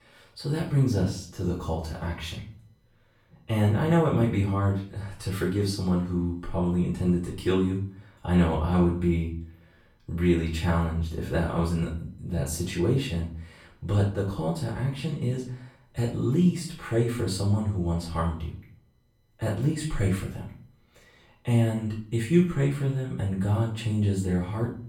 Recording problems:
off-mic speech; far
room echo; noticeable; dies away in 0.4 s

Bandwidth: 18 kHz